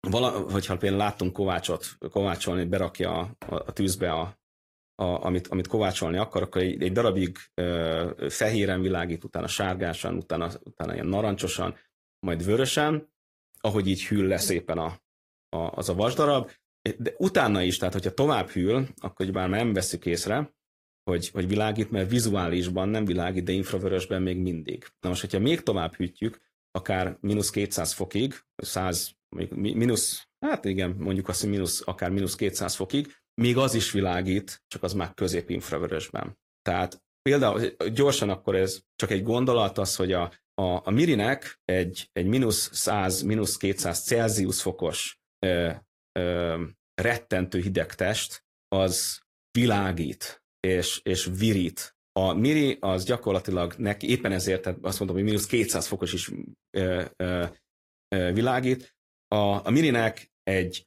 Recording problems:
garbled, watery; slightly

